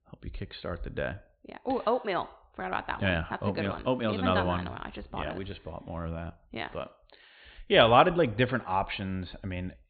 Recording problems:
high frequencies cut off; severe; nothing above 4.5 kHz

